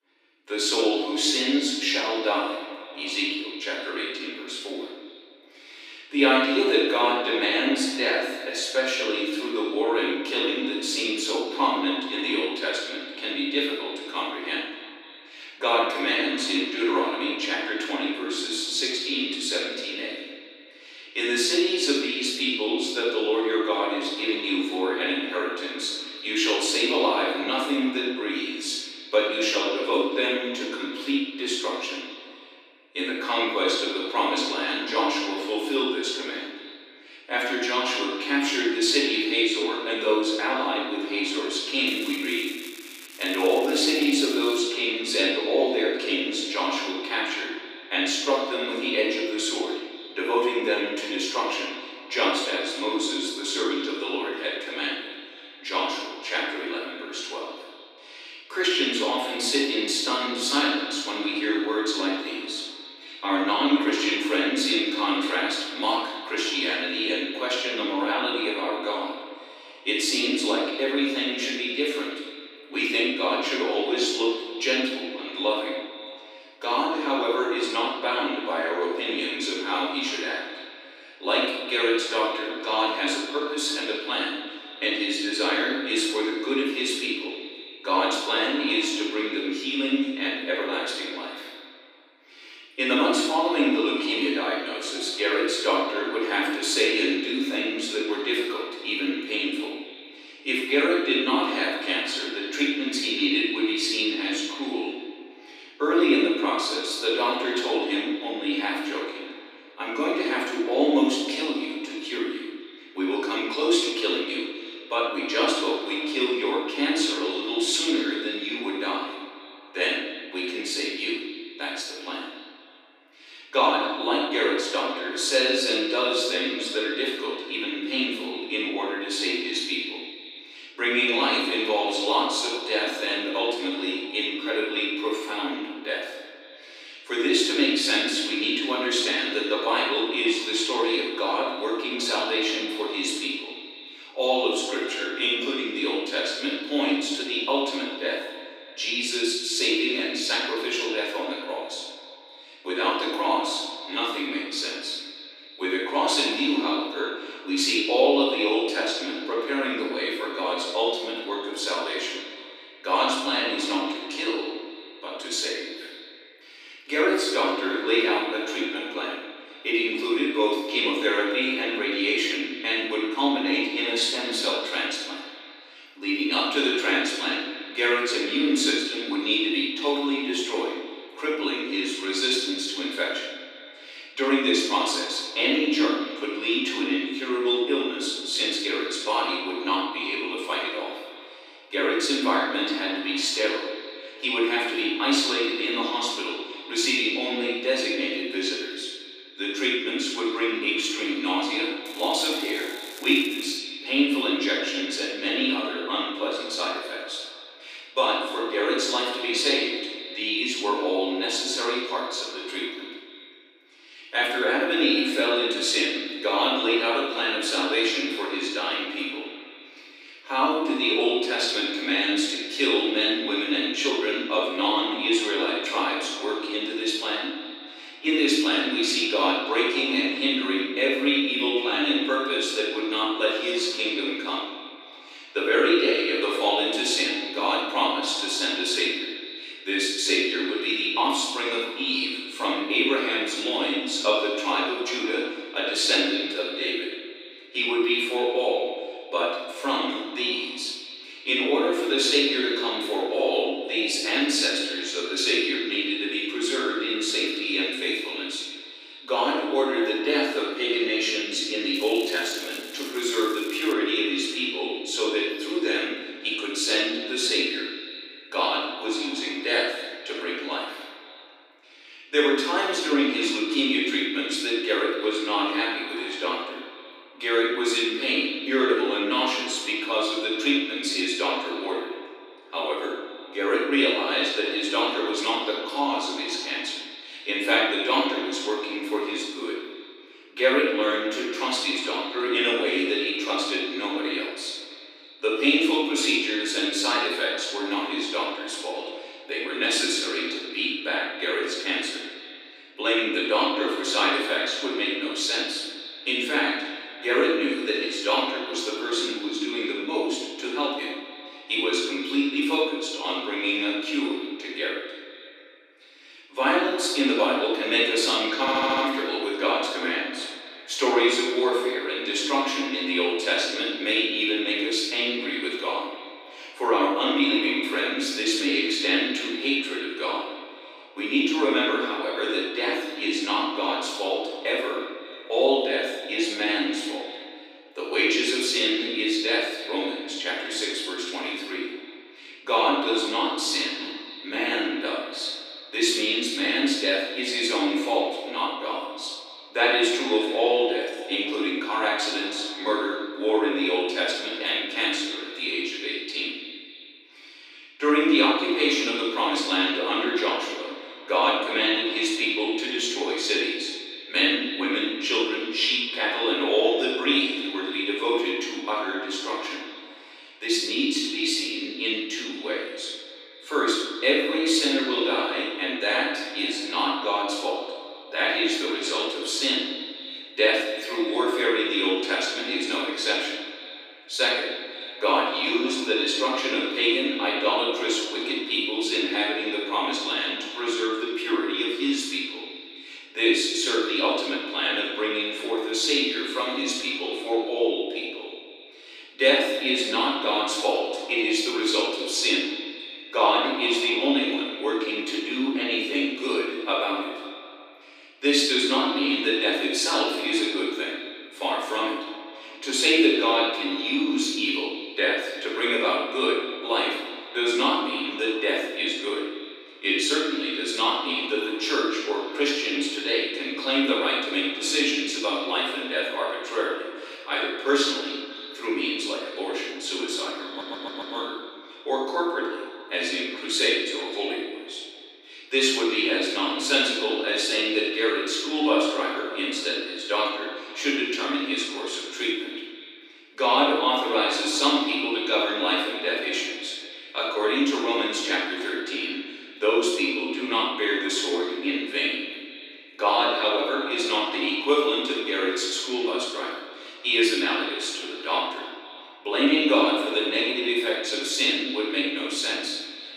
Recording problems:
room echo; strong; dies away in 1.2 s
off-mic speech; far
echo of what is said; noticeable; throughout; 260 ms later, 10 dB below the speech
thin; somewhat; fading below 300 Hz
crackling; noticeable; from 42 to 45 s, from 3:22 to 3:24 and from 4:22 to 4:24; 20 dB below the speech
audio stuttering; at 5:18 and at 7:10

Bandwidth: 15 kHz